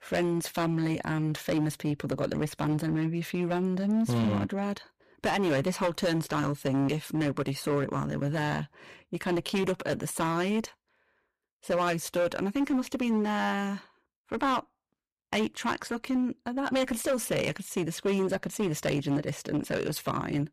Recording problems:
distortion; slight; 10% of the sound clipped

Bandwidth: 14.5 kHz